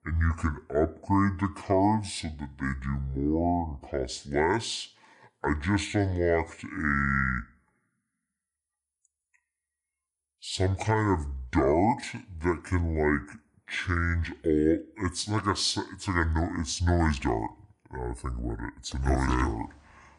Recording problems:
wrong speed and pitch; too slow and too low; 0.6 times normal speed

